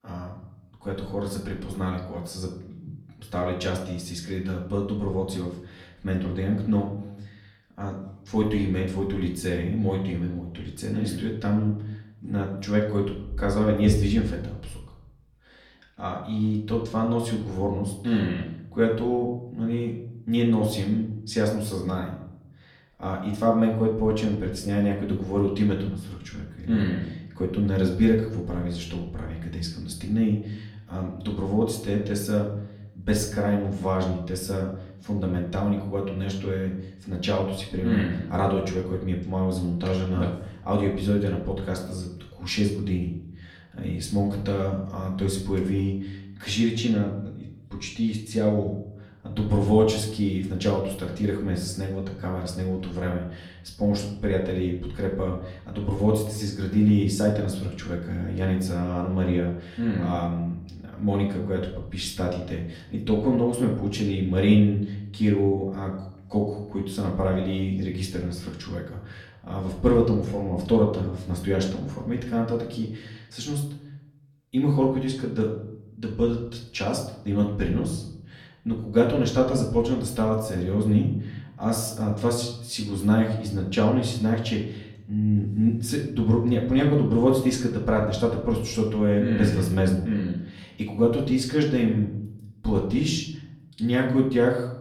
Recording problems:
off-mic speech; far
room echo; slight; dies away in 0.6 s

